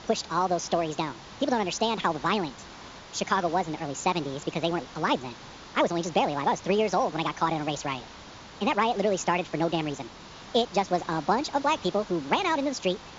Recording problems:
wrong speed and pitch; too fast and too high; 1.6 times normal speed
high frequencies cut off; noticeable; nothing above 7.5 kHz
hiss; noticeable; throughout; 15 dB below the speech

